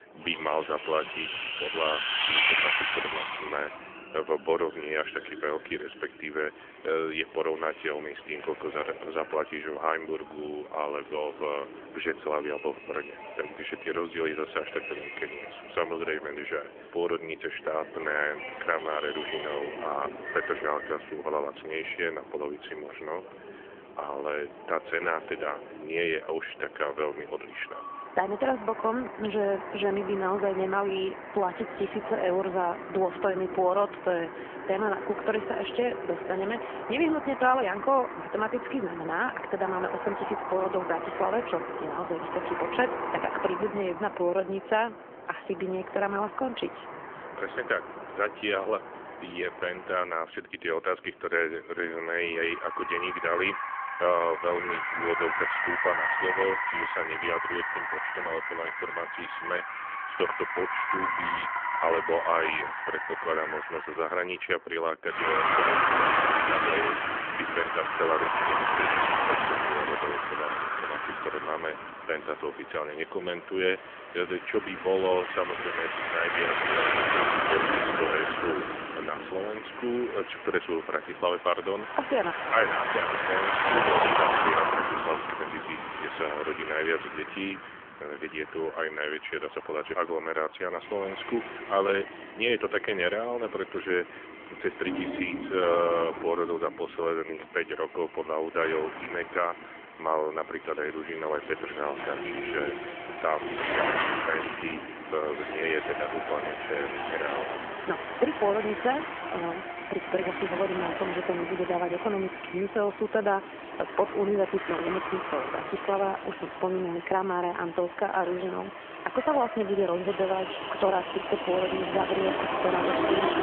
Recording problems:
phone-call audio; nothing above 3.5 kHz
traffic noise; loud; throughout; as loud as the speech

